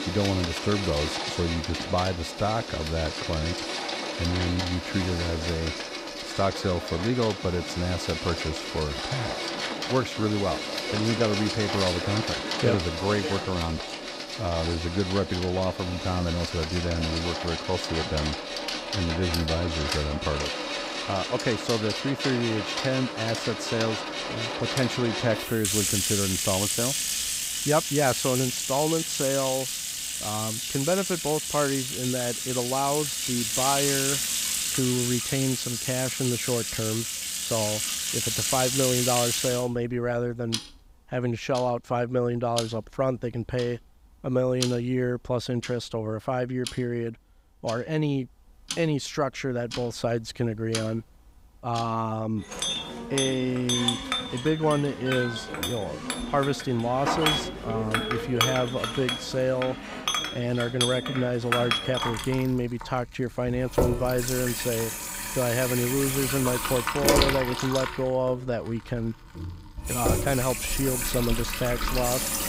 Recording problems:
household noises; loud; throughout; as loud as the speech

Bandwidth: 15.5 kHz